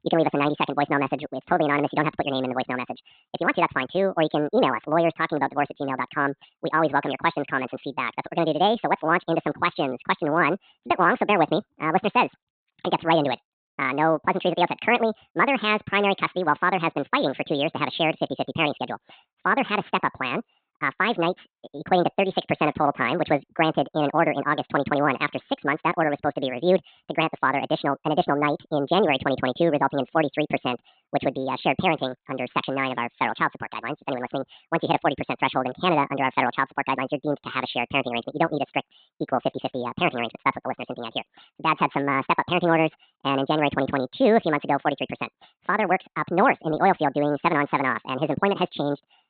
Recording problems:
high frequencies cut off; severe; nothing above 4 kHz
wrong speed and pitch; too fast and too high; 1.7 times normal speed

